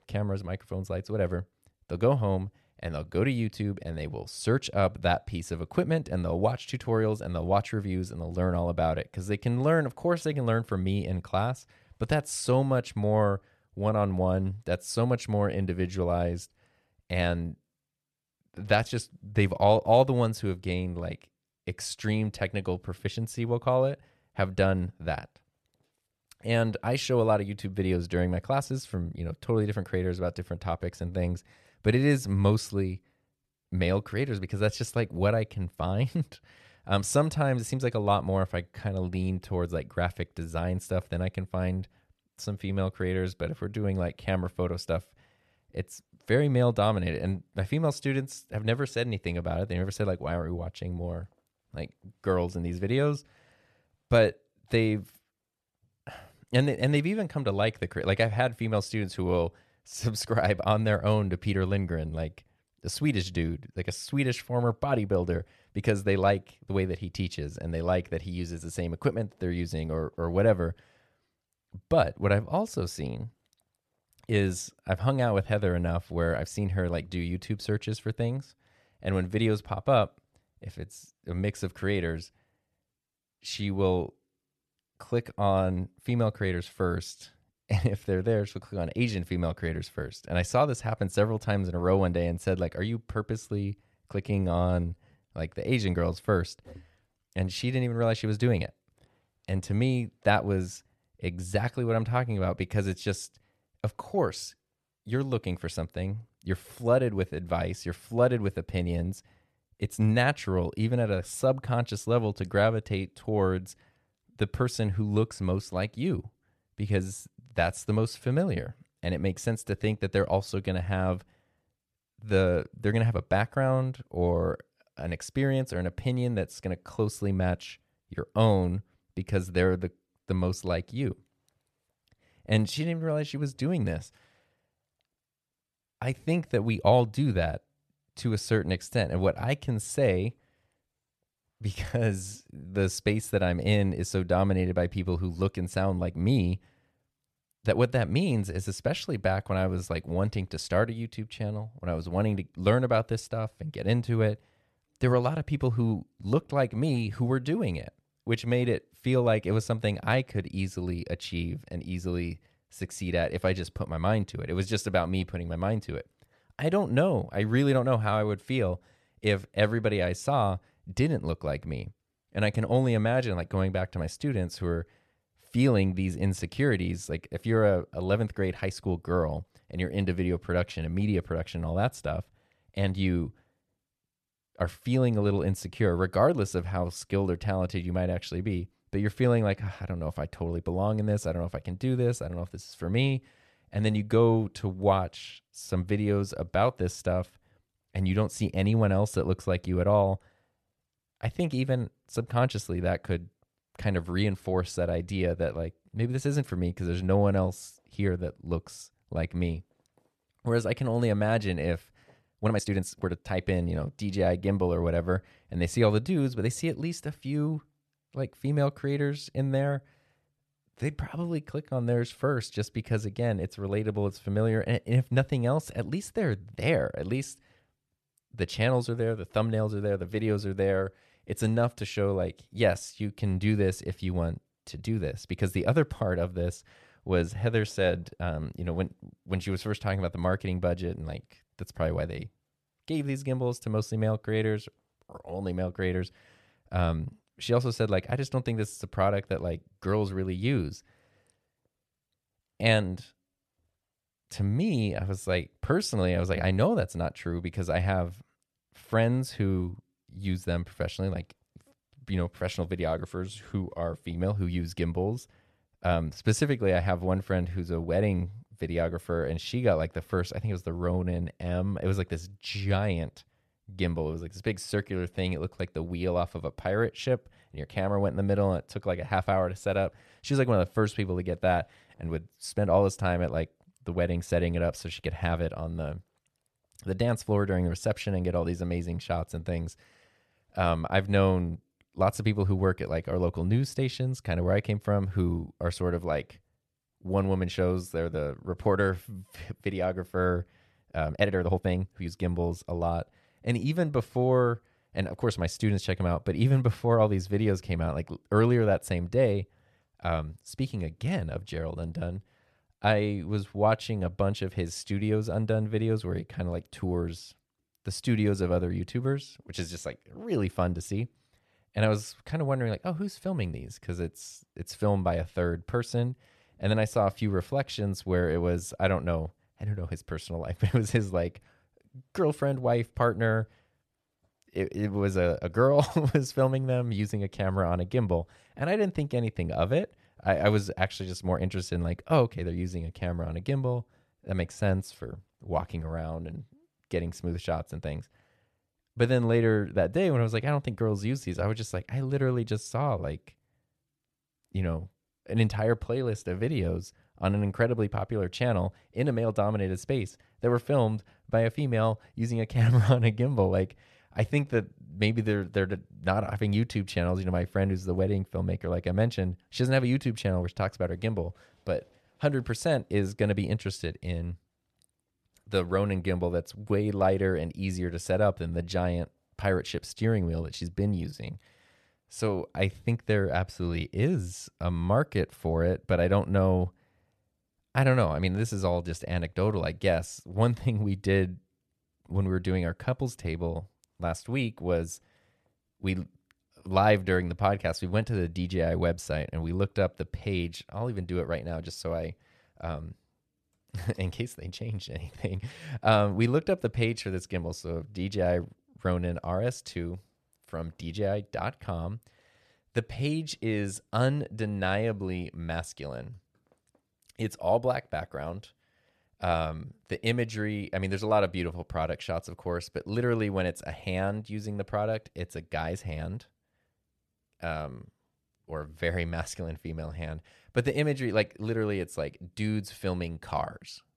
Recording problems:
uneven, jittery; strongly; from 1:34 to 5:02

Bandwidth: 13.5 kHz